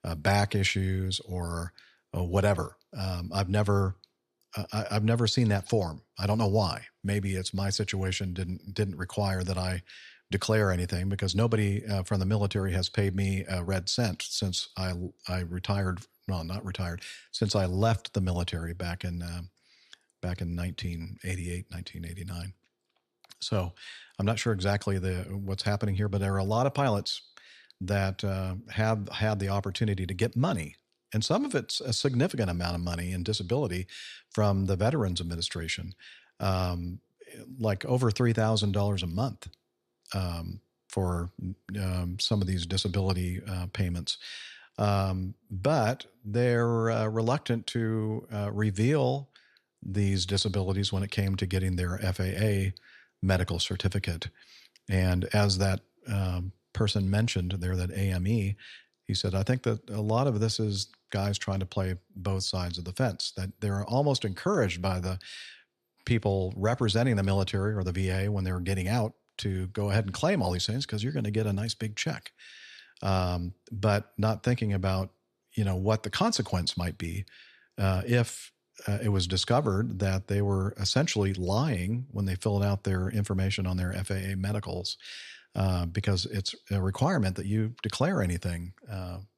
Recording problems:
none

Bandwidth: 13.5 kHz